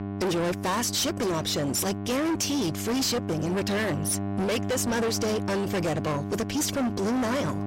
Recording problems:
distortion; heavy; 34% of the sound clipped
electrical hum; noticeable; throughout; 50 Hz, 10 dB below the speech

